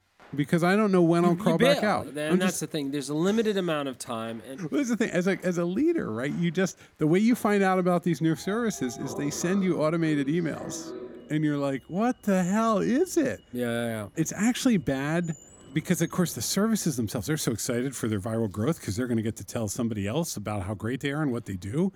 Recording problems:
household noises; faint; throughout; 20 dB below the speech

